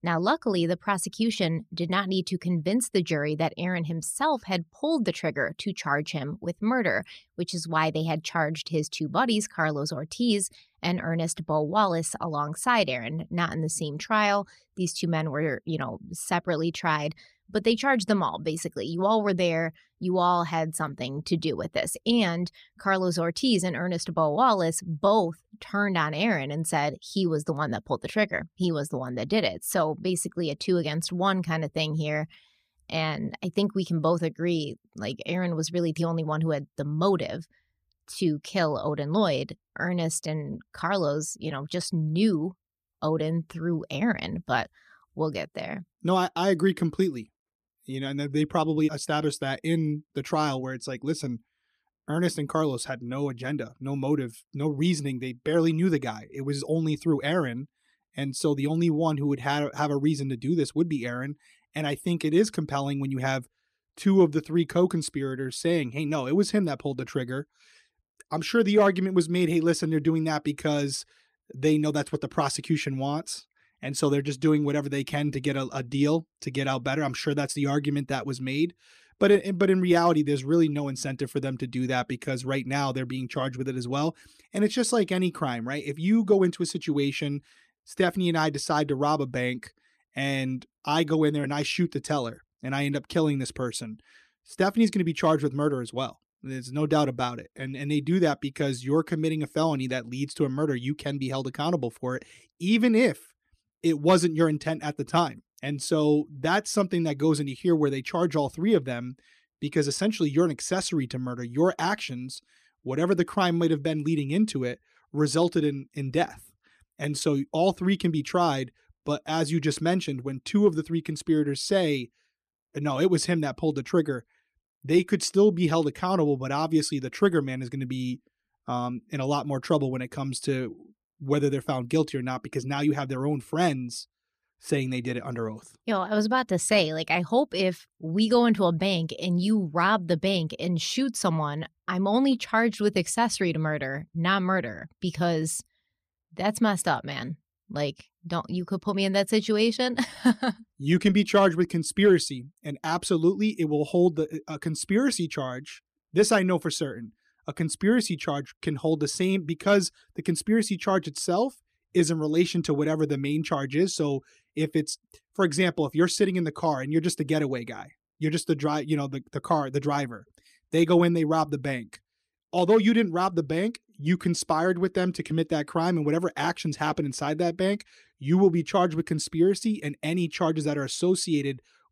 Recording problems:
none

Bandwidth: 14.5 kHz